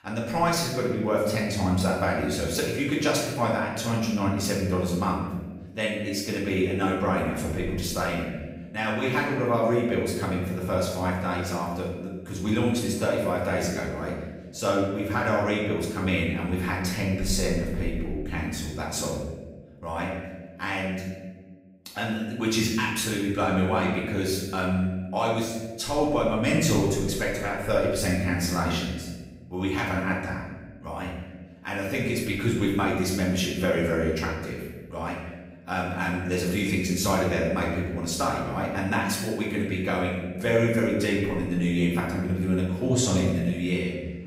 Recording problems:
off-mic speech; far
room echo; noticeable; dies away in 1.2 s

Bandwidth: 15.5 kHz